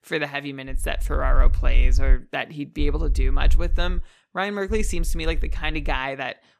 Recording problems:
low rumble; faint; from 0.5 to 2 s, from 3 to 4 s and from 4.5 to 6 s; 20 dB below the speech

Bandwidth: 14.5 kHz